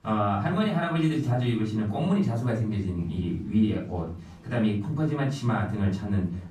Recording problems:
off-mic speech; far
room echo; slight; dies away in 0.6 s
chatter from many people; faint; throughout; 30 dB below the speech

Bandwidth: 14.5 kHz